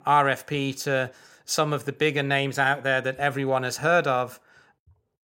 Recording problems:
none

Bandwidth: 16 kHz